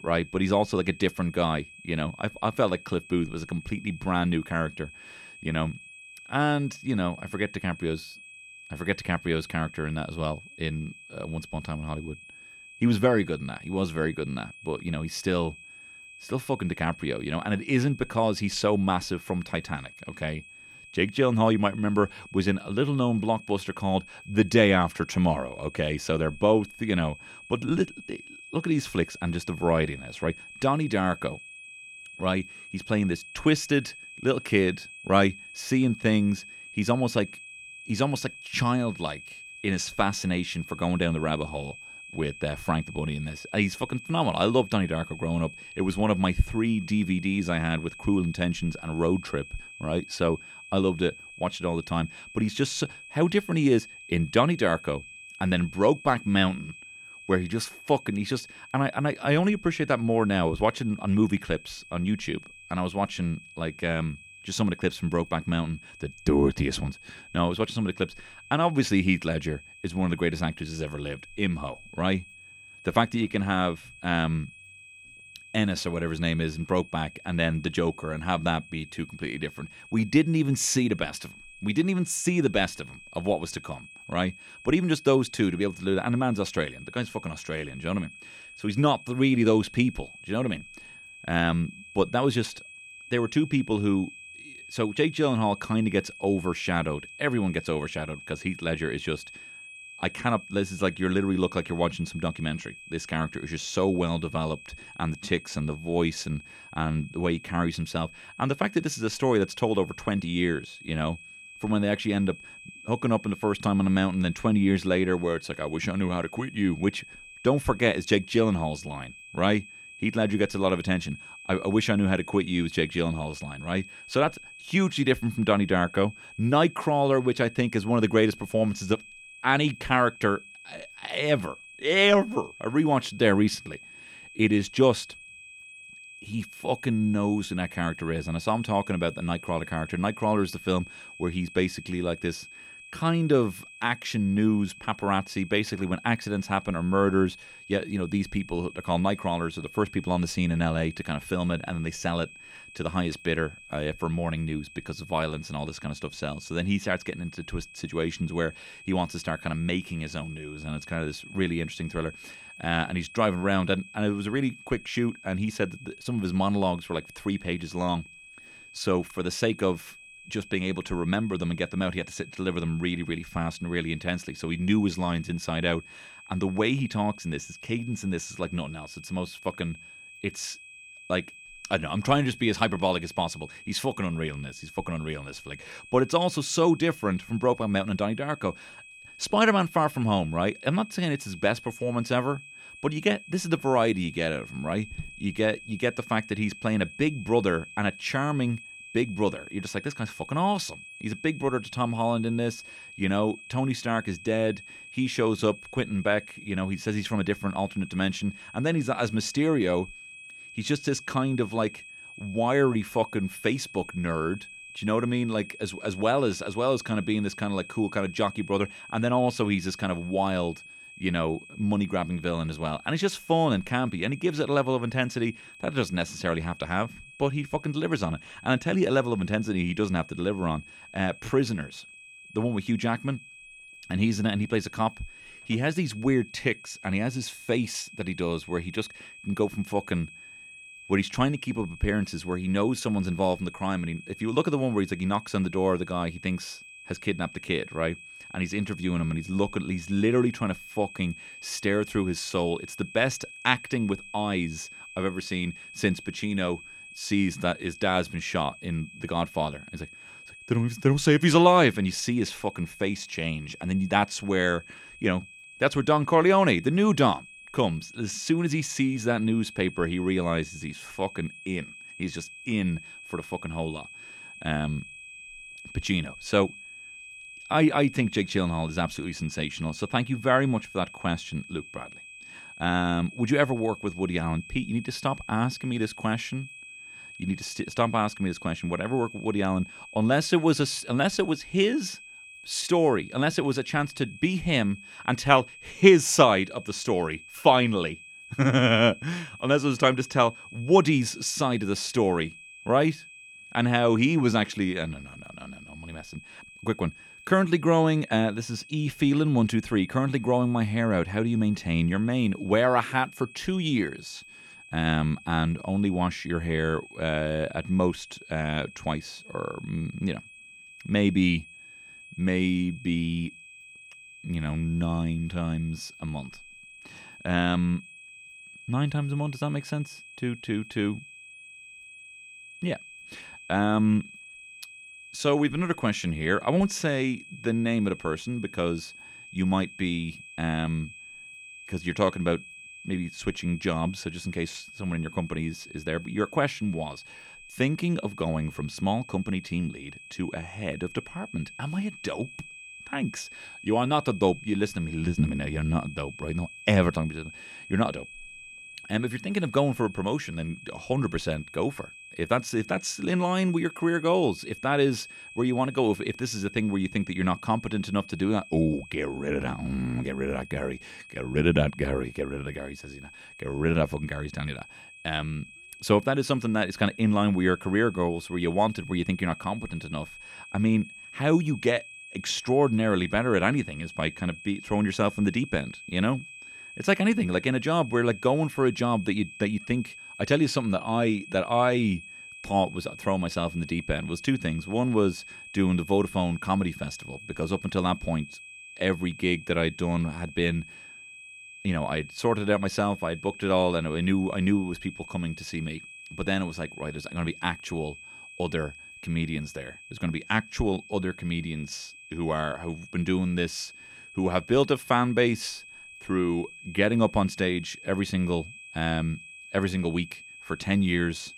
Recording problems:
high-pitched whine; noticeable; throughout; 2.5 kHz, 15 dB below the speech

